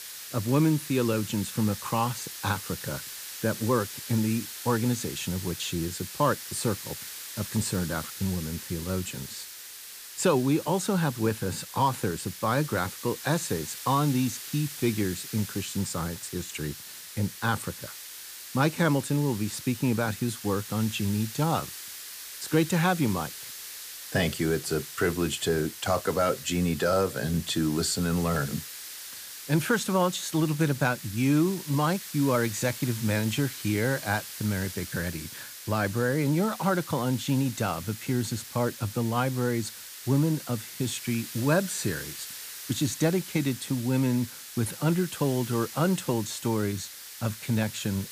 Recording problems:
hiss; noticeable; throughout; 10 dB below the speech

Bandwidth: 15 kHz